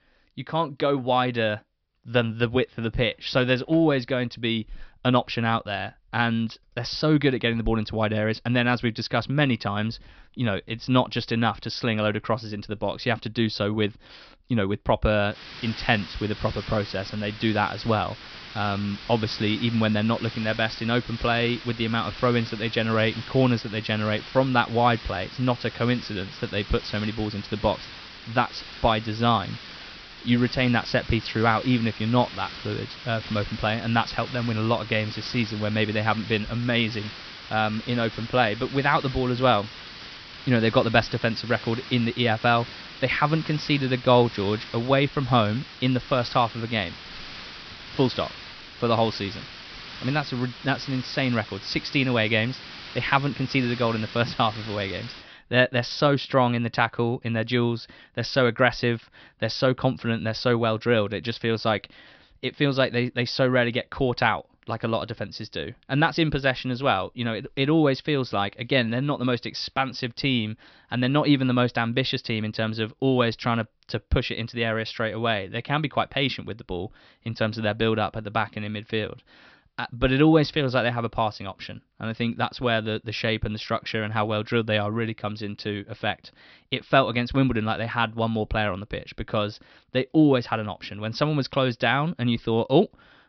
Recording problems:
high frequencies cut off; noticeable; nothing above 5.5 kHz
hiss; noticeable; from 15 to 55 s; 15 dB below the speech

